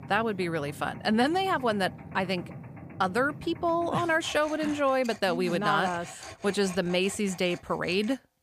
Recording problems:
machinery noise; noticeable; throughout; 15 dB below the speech

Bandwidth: 15 kHz